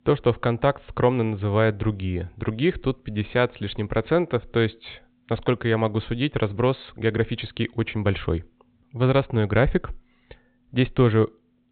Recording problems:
high frequencies cut off; severe; nothing above 4 kHz

